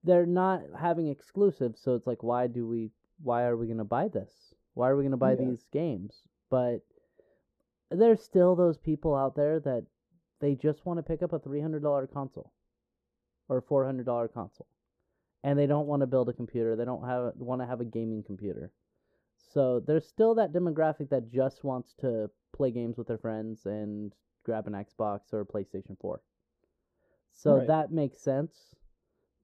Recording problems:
muffled; very; fading above 1.5 kHz

